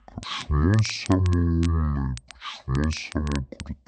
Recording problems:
wrong speed and pitch; too slow and too low; 0.5 times normal speed
crackle, like an old record; noticeable; 20 dB below the speech

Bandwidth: 8.5 kHz